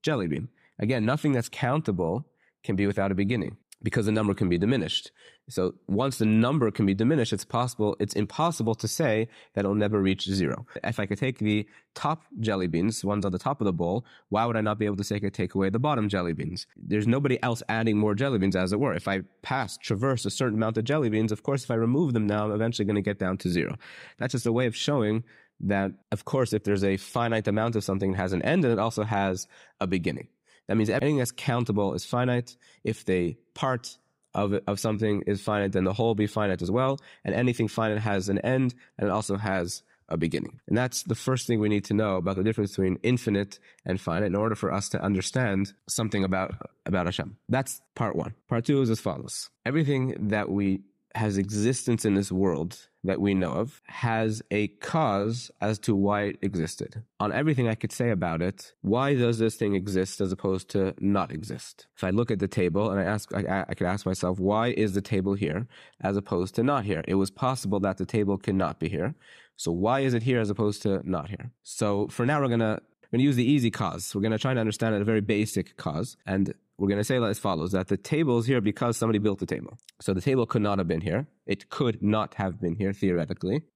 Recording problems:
none

